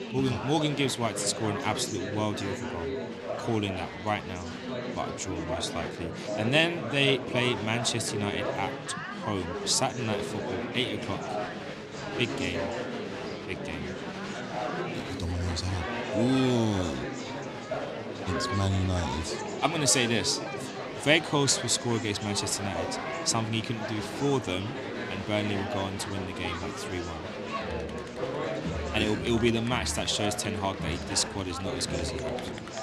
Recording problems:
chatter from many people; loud; throughout; 5 dB below the speech

